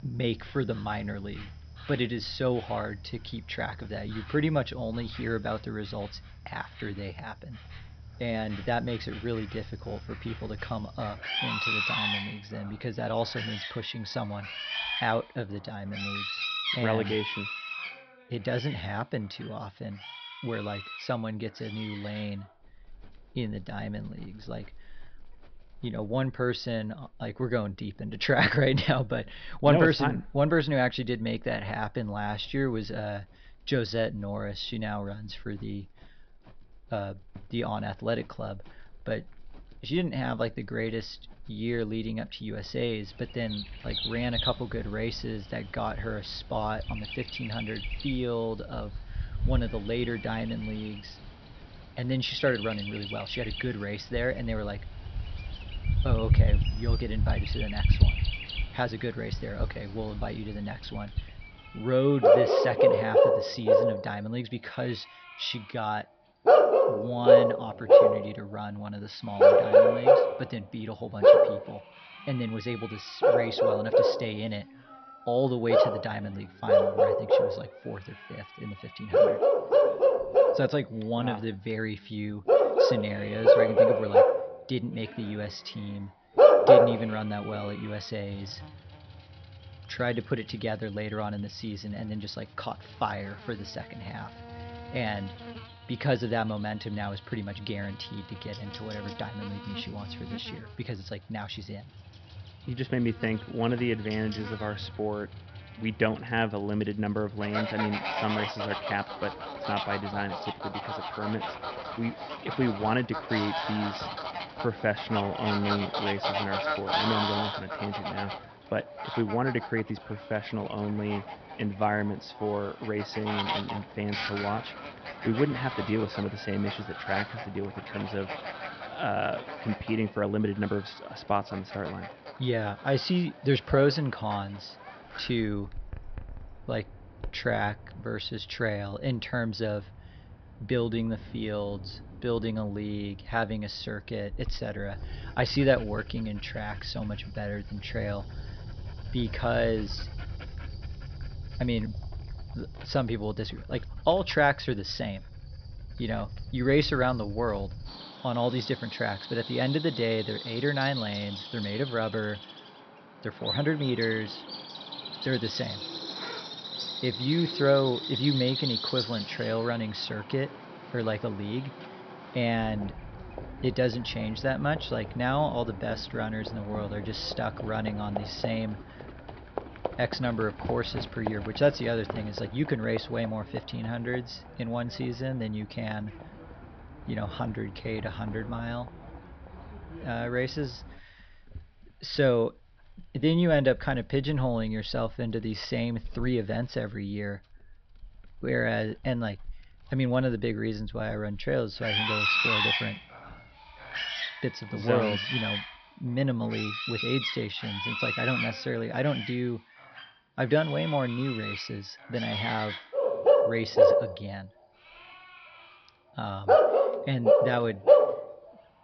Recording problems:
high frequencies cut off; noticeable; nothing above 5.5 kHz
animal sounds; very loud; throughout; 4 dB above the speech

